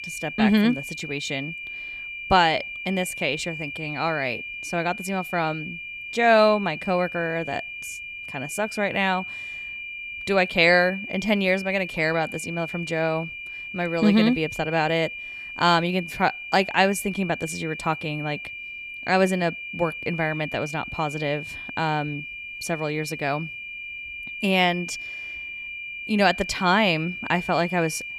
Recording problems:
high-pitched whine; loud; throughout; 2.5 kHz, 9 dB below the speech

